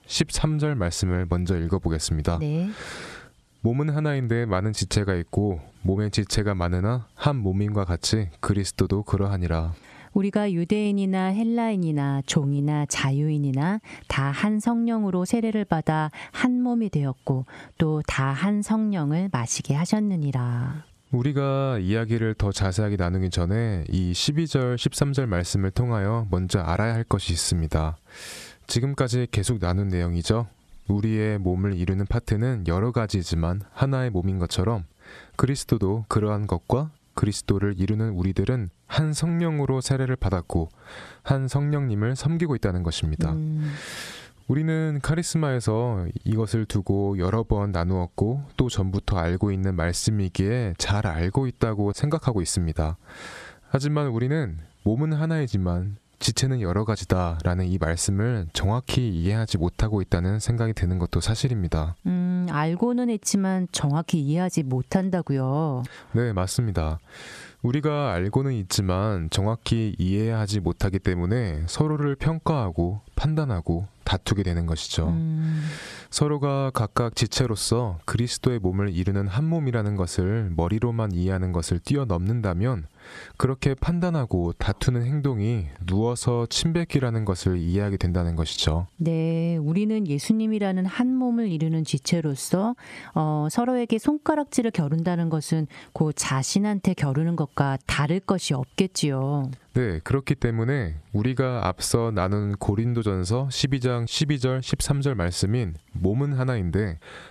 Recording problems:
squashed, flat; somewhat

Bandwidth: 13.5 kHz